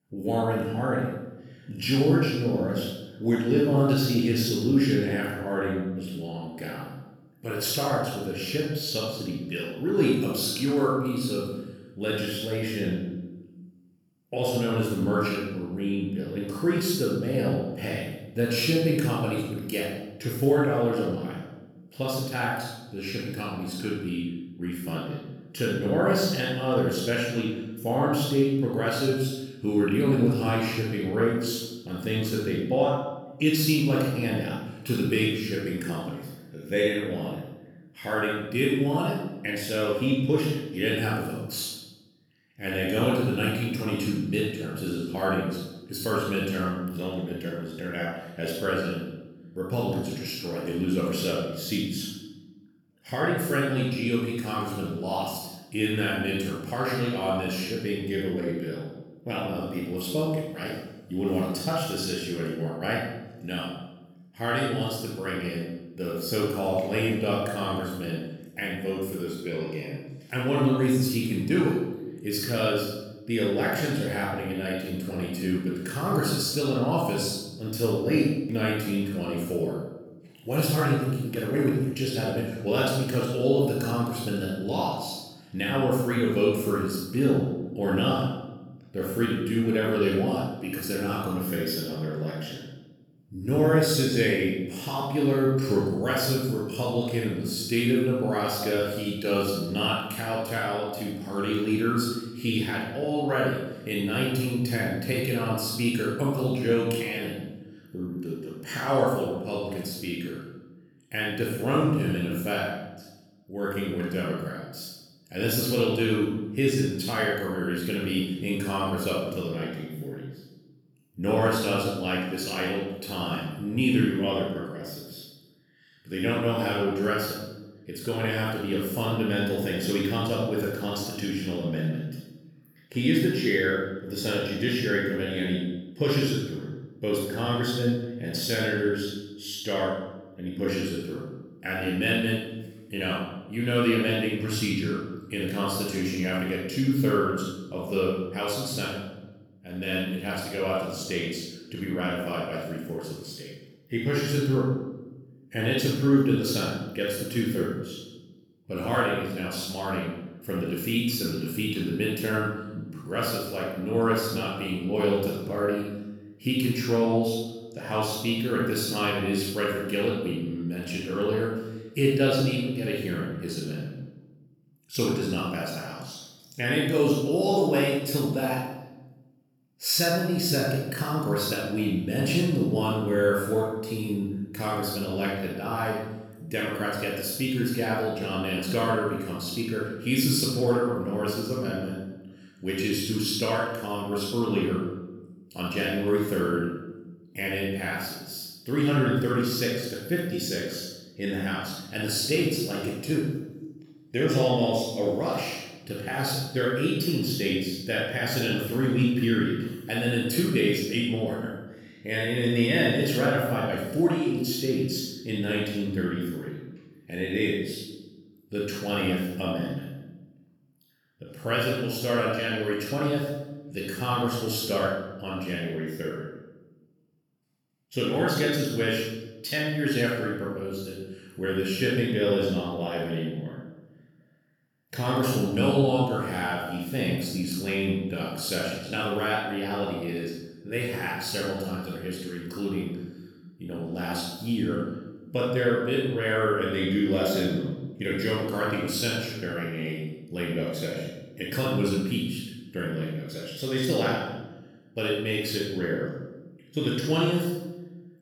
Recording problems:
room echo; strong; dies away in 0.9 s
off-mic speech; far

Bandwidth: 18.5 kHz